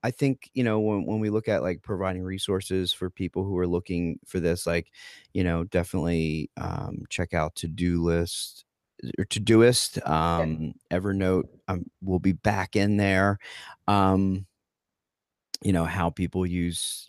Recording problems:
none

